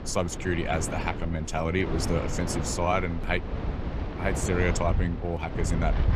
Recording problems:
wind in the background; loud; throughout; 3 dB below the speech

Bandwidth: 15 kHz